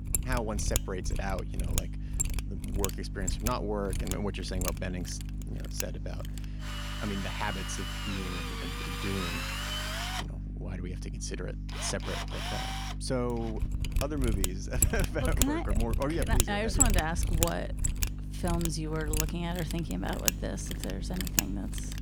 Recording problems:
machinery noise; very loud; throughout; 2 dB above the speech
electrical hum; noticeable; throughout; 50 Hz, 15 dB below the speech
chatter from many people; faint; throughout; 30 dB below the speech

